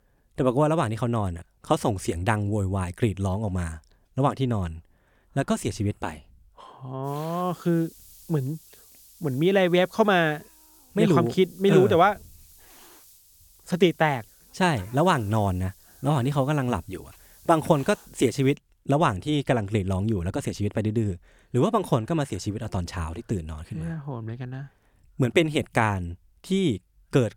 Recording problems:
hiss; faint; from 7 to 19 s; 25 dB below the speech

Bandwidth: 18 kHz